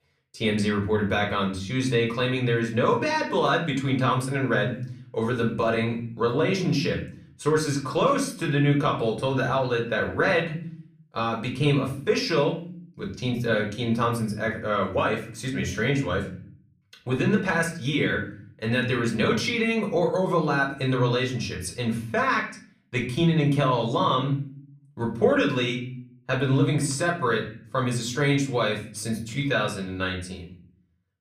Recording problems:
off-mic speech; far
room echo; slight; dies away in 0.5 s

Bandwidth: 15 kHz